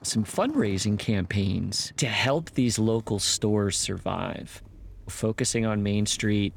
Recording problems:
traffic noise; faint; throughout; 20 dB below the speech

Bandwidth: 18.5 kHz